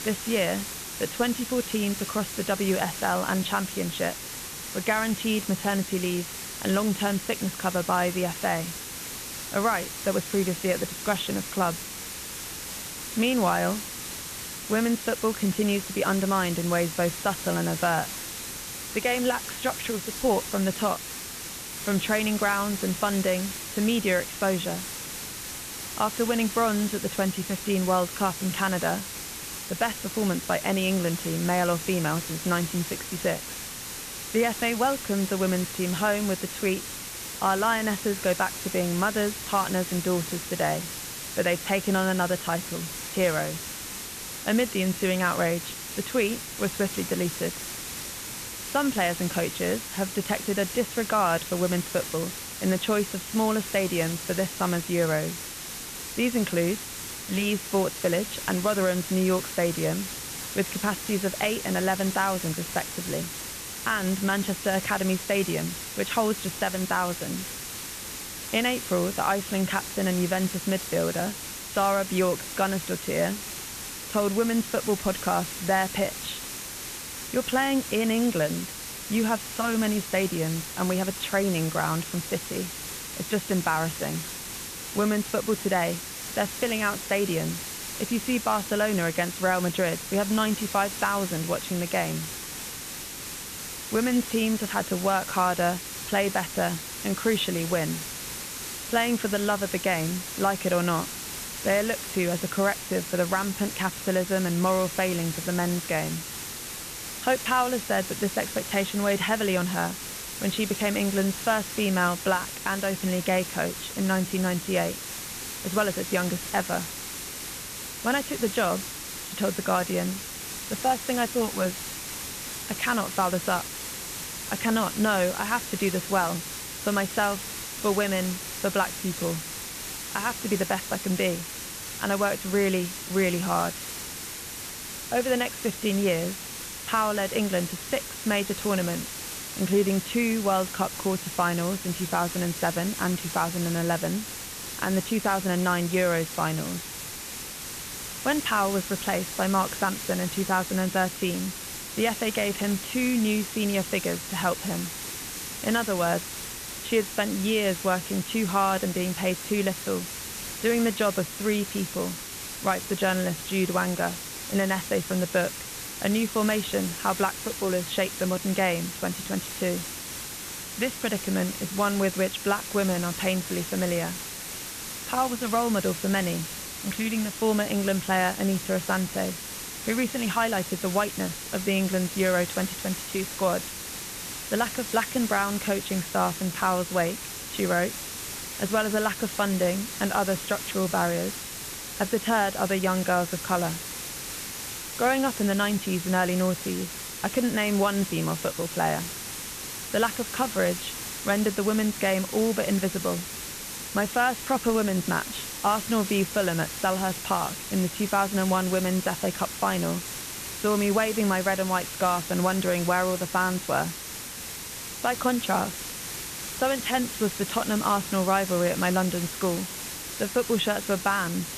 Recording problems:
high frequencies cut off; severe; nothing above 4 kHz
hiss; loud; throughout; 7 dB below the speech

